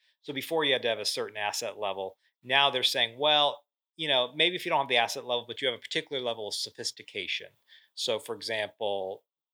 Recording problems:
thin; somewhat; fading below 400 Hz

